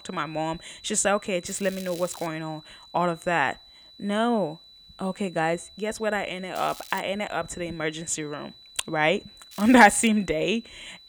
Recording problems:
crackling; noticeable; at 1.5 s, at 6.5 s and at 9.5 s; 20 dB below the speech
high-pitched whine; faint; throughout; 4 kHz, 20 dB below the speech

